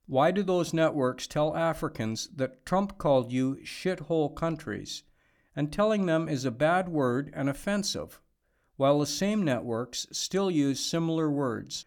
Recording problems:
none

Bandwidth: 18.5 kHz